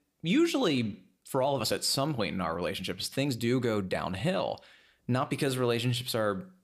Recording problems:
uneven, jittery; strongly; from 0.5 to 6 s

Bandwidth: 15 kHz